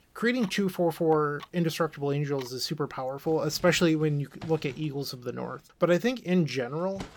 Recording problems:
household noises; faint; throughout; 20 dB below the speech

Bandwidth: 18 kHz